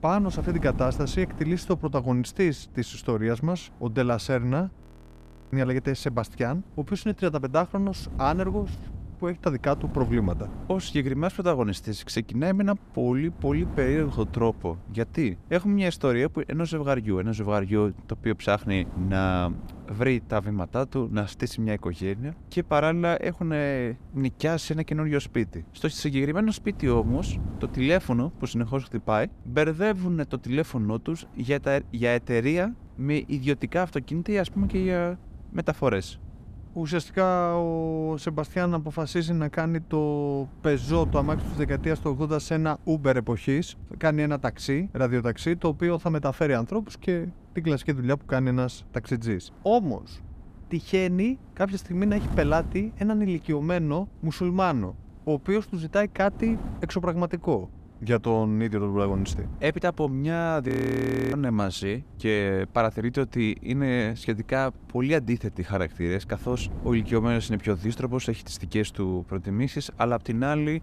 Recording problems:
wind noise on the microphone; occasional gusts; 20 dB below the speech
audio freezing; at 5 s for 0.5 s and at 1:01 for 0.5 s

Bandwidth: 14.5 kHz